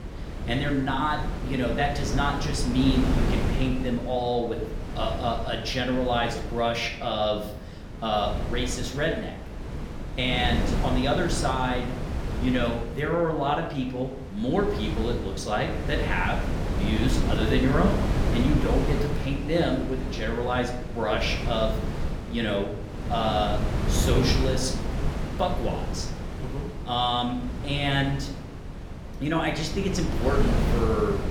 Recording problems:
room echo; slight; dies away in 0.6 s
off-mic speech; somewhat distant
wind noise on the microphone; heavy; 8 dB below the speech

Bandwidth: 17.5 kHz